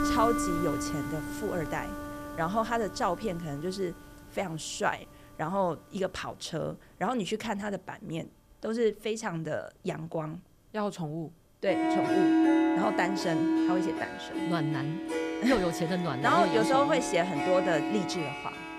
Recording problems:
background music; very loud; throughout; 1 dB above the speech

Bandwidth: 14.5 kHz